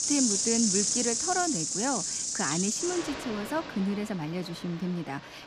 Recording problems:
animal sounds; very loud; throughout; 4 dB above the speech

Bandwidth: 15 kHz